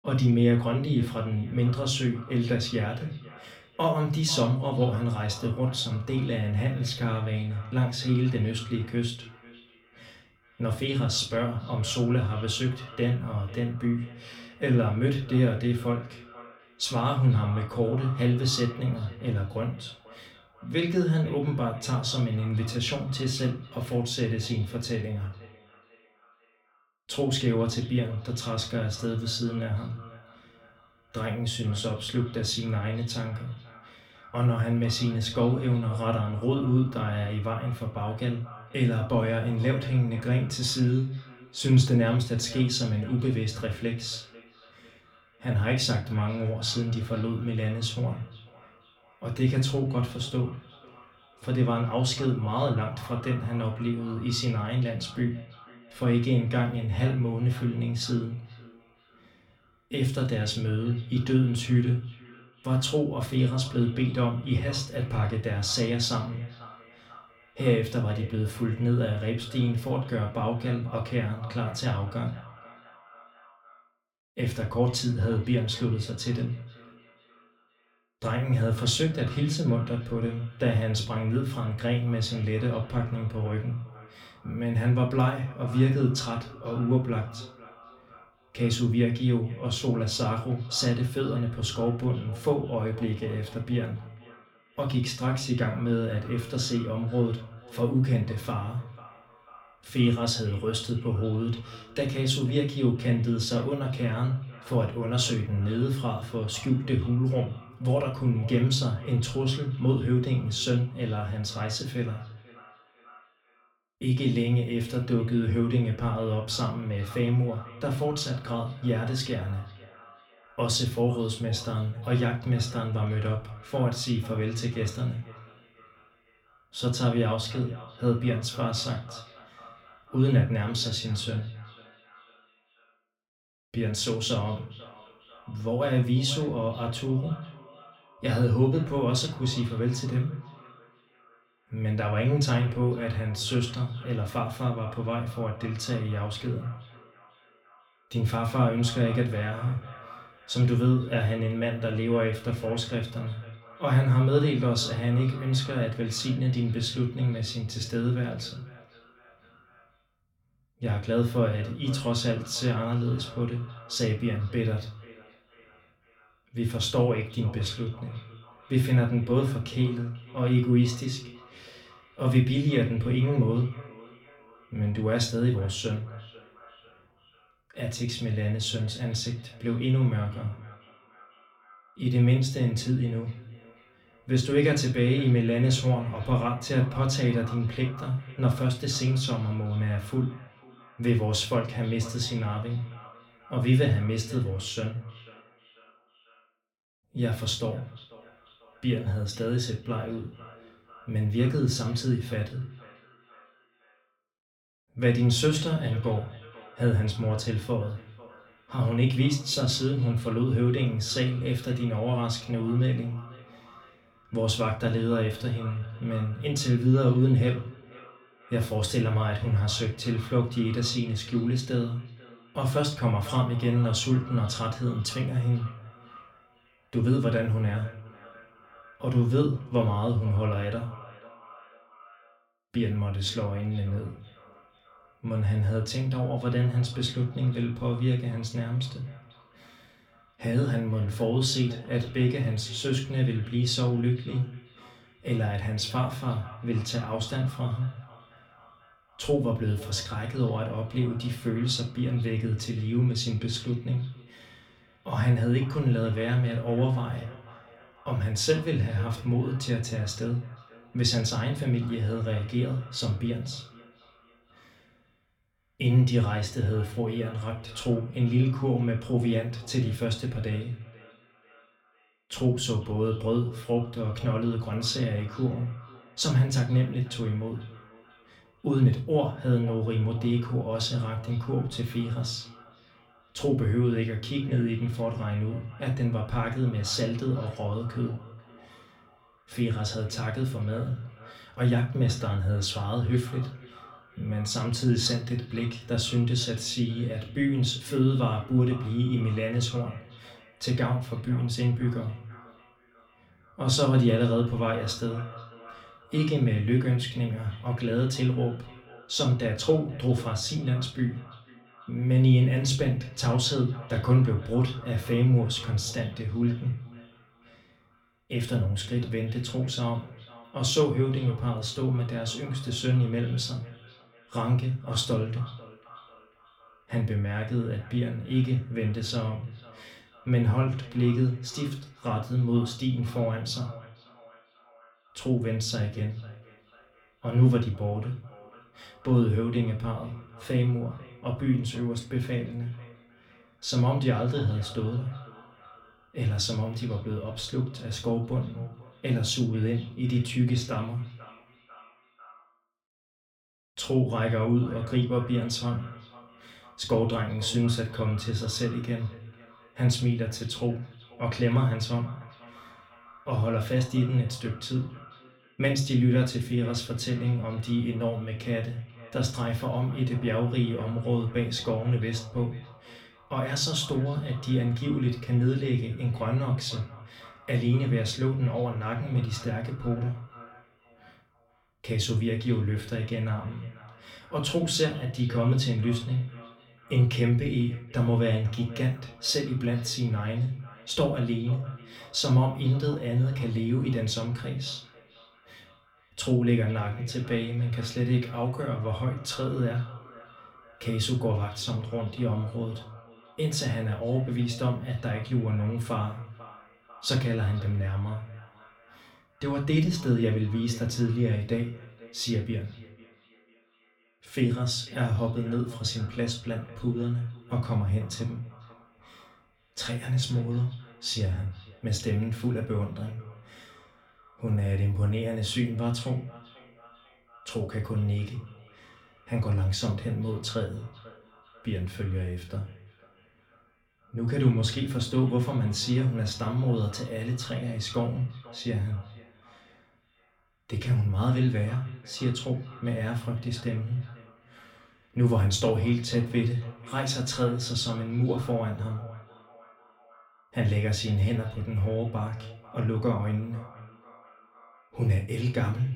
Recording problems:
off-mic speech; far
echo of what is said; faint; throughout; 490 ms later, 20 dB below the speech
room echo; very slight; dies away in 0.3 s

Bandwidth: 17 kHz